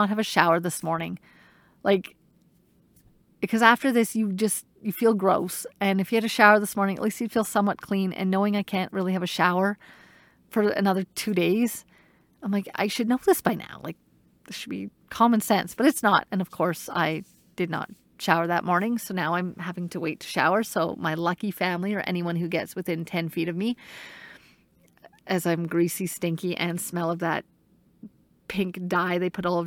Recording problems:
abrupt cut into speech; at the start and the end

